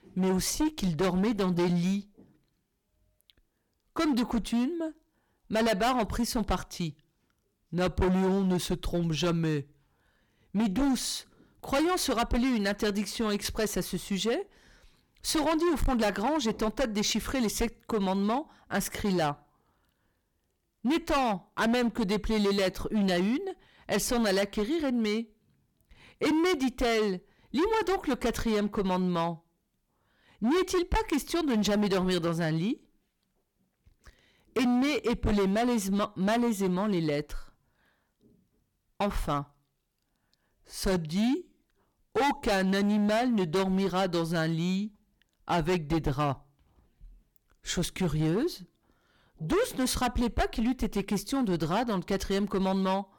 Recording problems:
distortion; heavy; 14% of the sound clipped

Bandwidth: 18 kHz